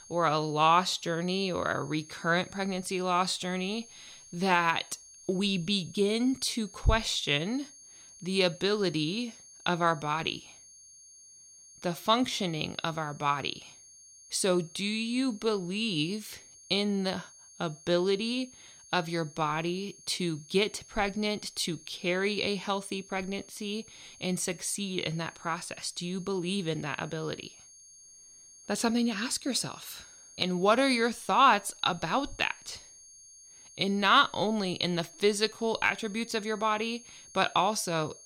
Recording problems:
high-pitched whine; faint; throughout; 6.5 kHz, 20 dB below the speech

